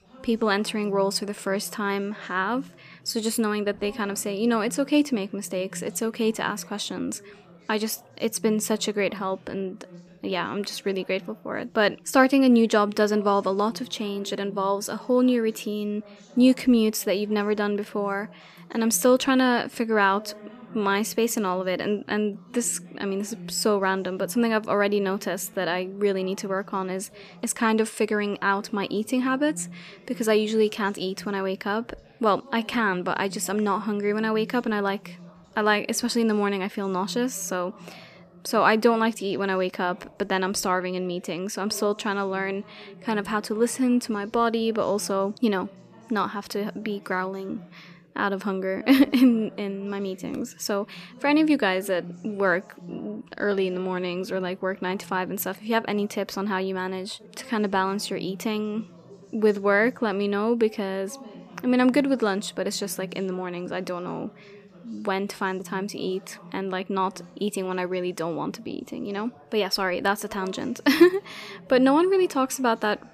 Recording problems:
background chatter; faint; throughout; 3 voices, 20 dB below the speech

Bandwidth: 14.5 kHz